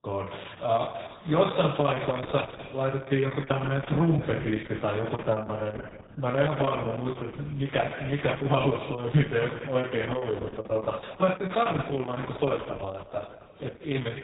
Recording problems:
garbled, watery; badly; nothing above 4 kHz
room echo; noticeable; dies away in 1.7 s
off-mic speech; somewhat distant
choppy; occasionally; from 3.5 to 5 s; 3% of the speech affected

